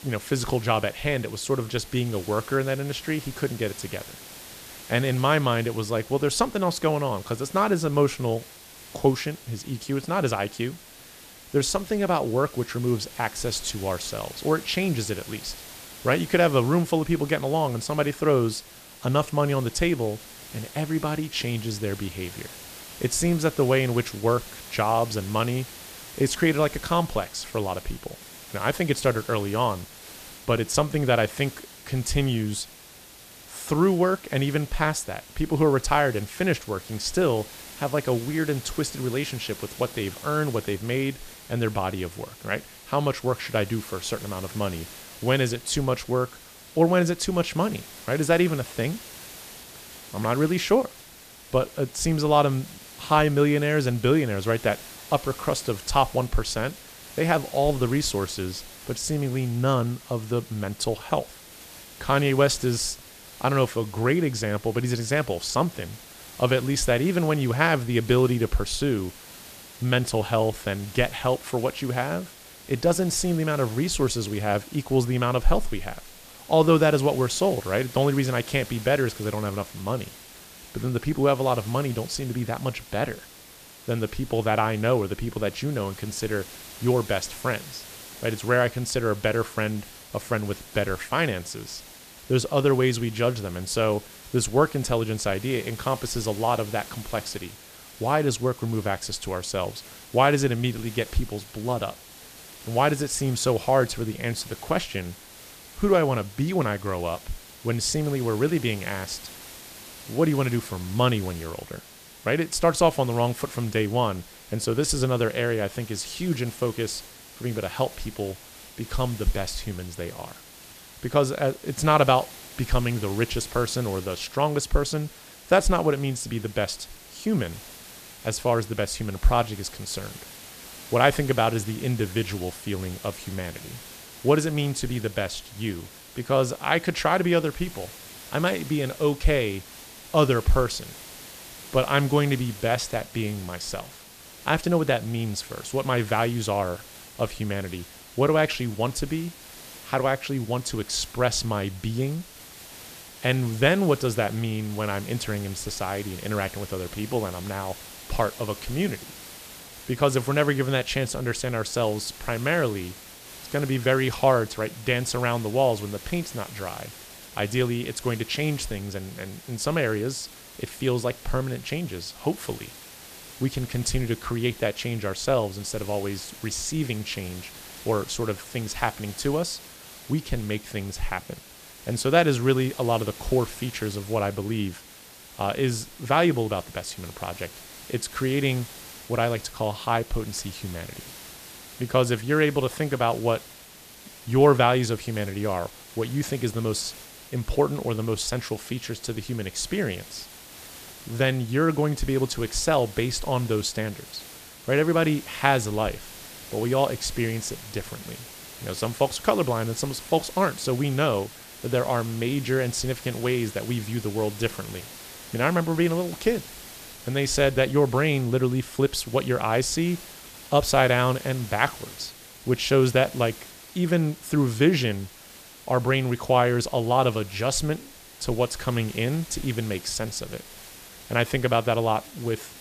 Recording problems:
hiss; noticeable; throughout; 15 dB below the speech

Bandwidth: 14.5 kHz